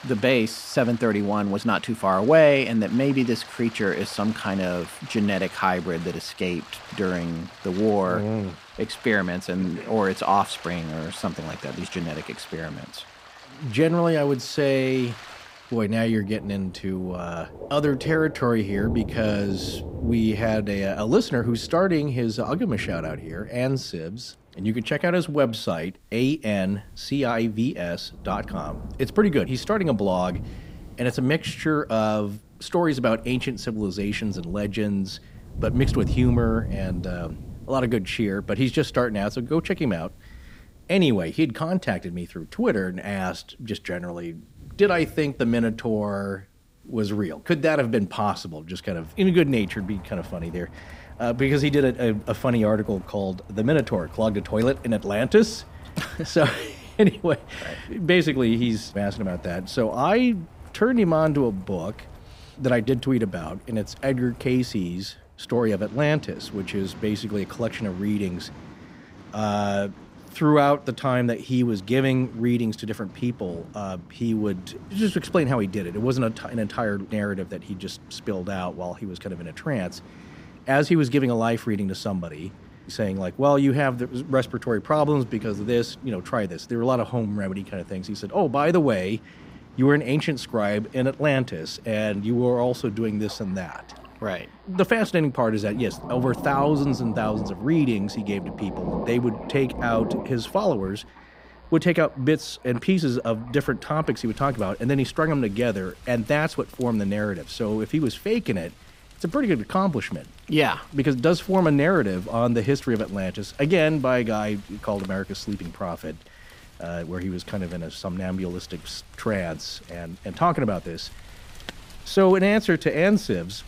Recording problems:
rain or running water; noticeable; throughout; 15 dB below the speech

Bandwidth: 15.5 kHz